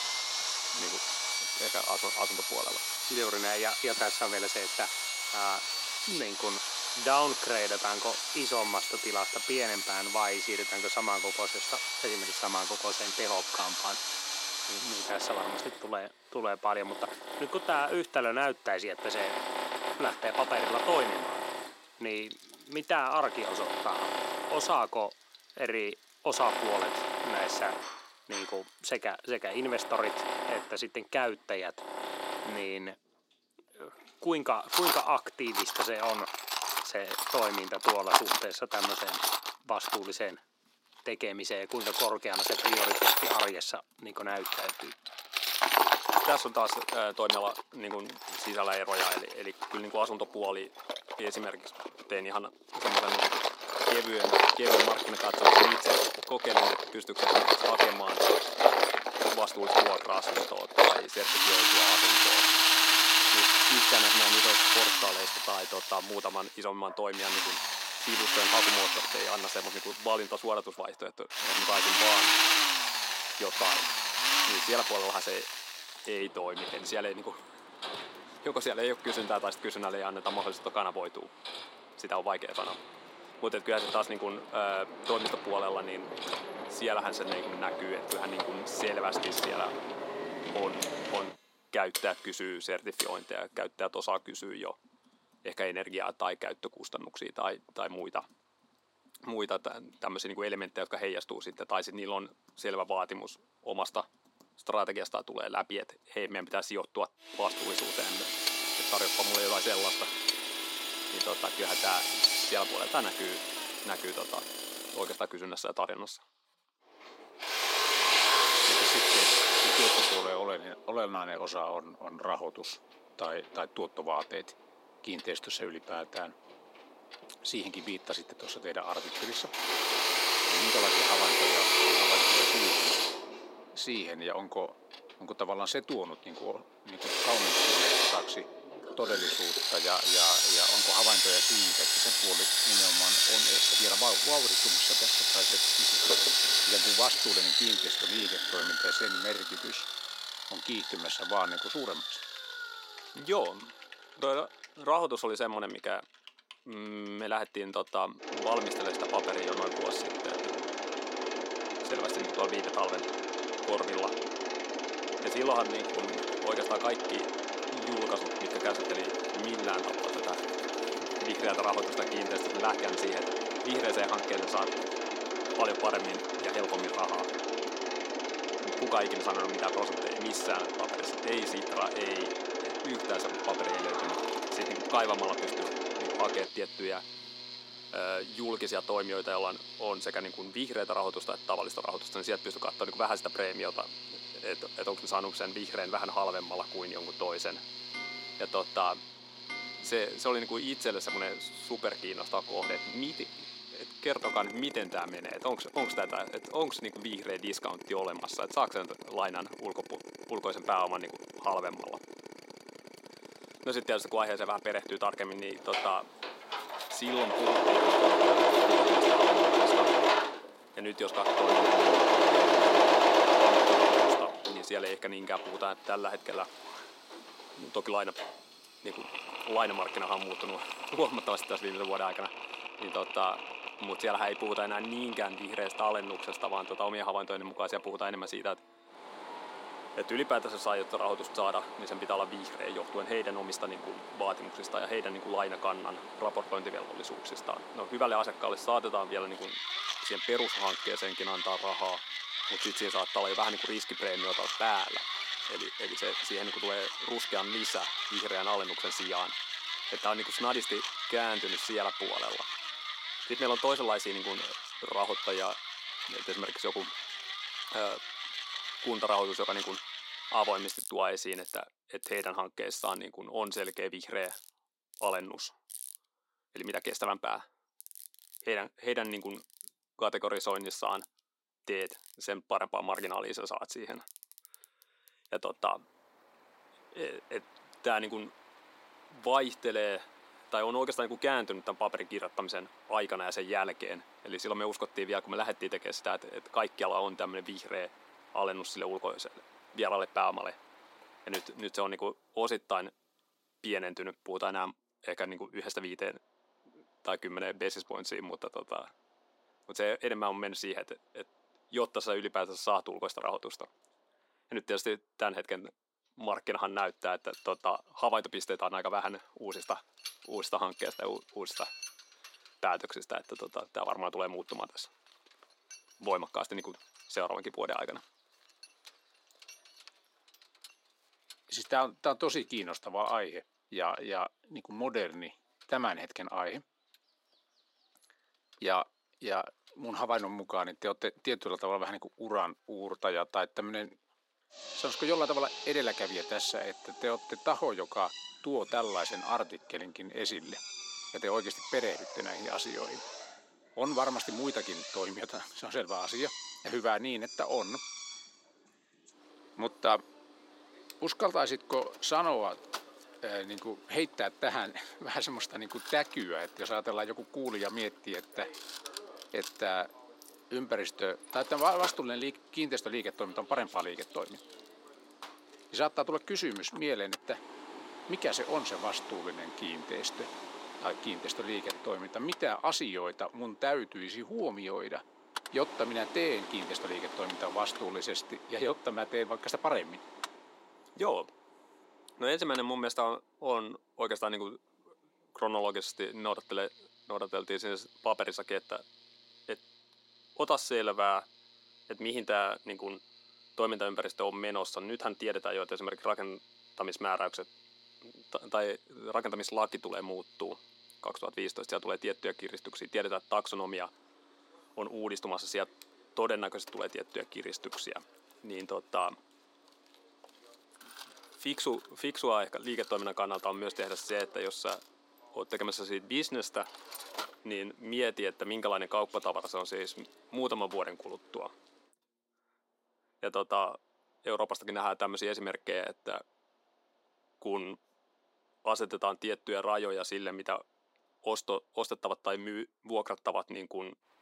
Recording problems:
thin; somewhat; fading below 300 Hz
machinery noise; very loud; throughout; 6 dB above the speech
household noises; noticeable; until 3:59; 15 dB below the speech

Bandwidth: 16 kHz